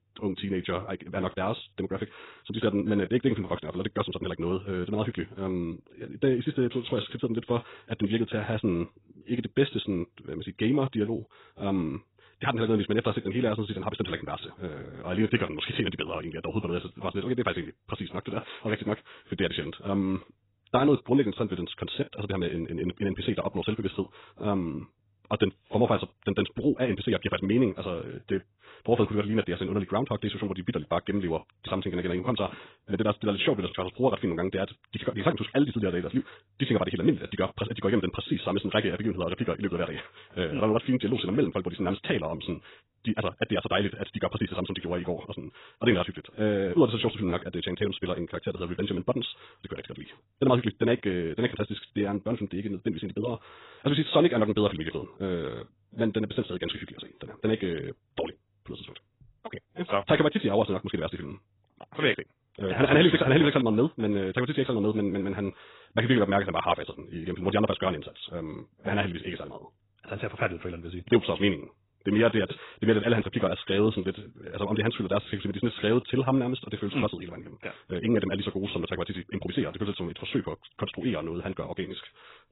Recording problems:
garbled, watery; badly; nothing above 4 kHz
wrong speed, natural pitch; too fast; 1.6 times normal speed

